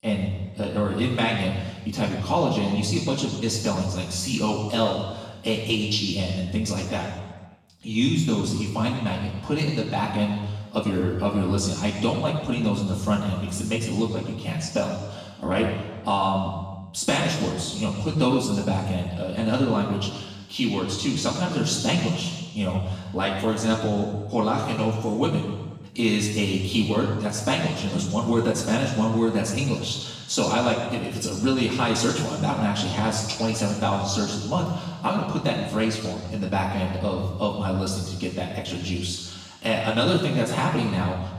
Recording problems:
off-mic speech; far
room echo; noticeable; dies away in 1.2 s

